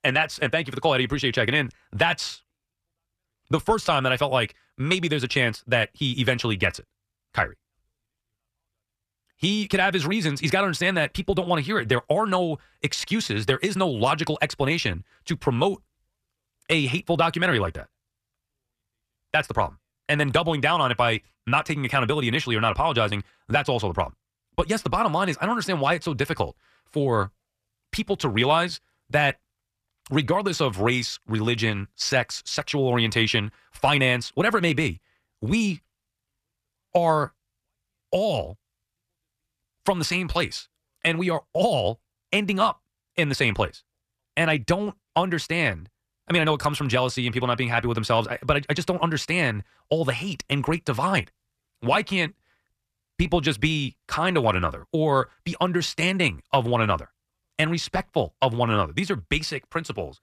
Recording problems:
wrong speed, natural pitch; too fast; 1.5 times normal speed

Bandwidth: 14.5 kHz